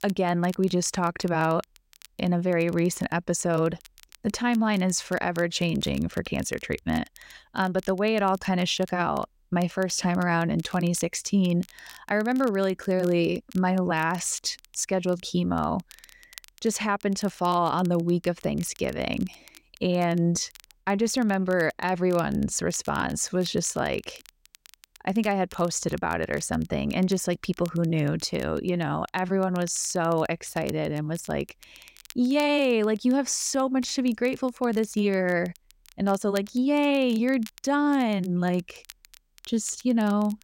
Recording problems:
crackle, like an old record; faint; 25 dB below the speech

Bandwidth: 16 kHz